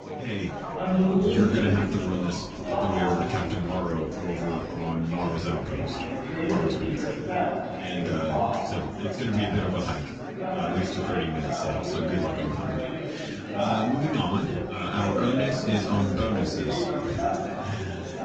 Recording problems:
off-mic speech; far
room echo; noticeable; dies away in 0.2 s
garbled, watery; slightly; nothing above 18.5 kHz
chatter from many people; very loud; throughout; as loud as the speech
door banging; noticeable; from 0.5 to 7.5 s; peak 8 dB below the speech

